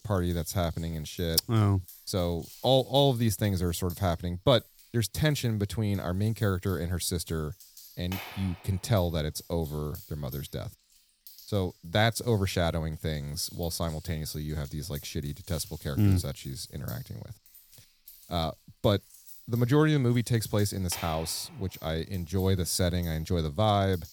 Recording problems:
household noises; noticeable; throughout; 20 dB below the speech

